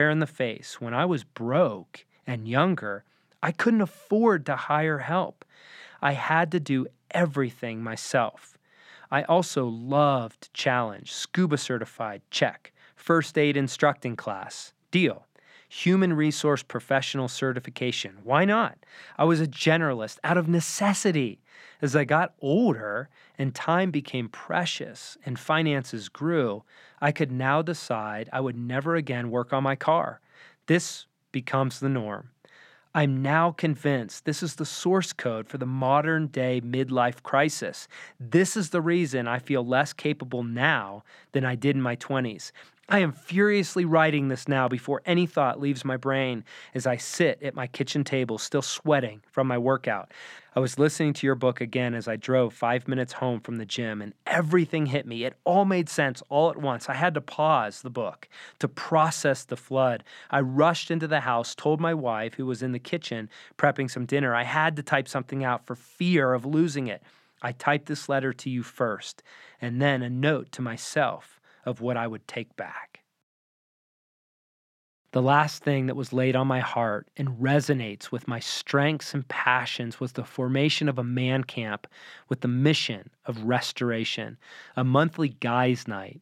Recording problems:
abrupt cut into speech; at the start

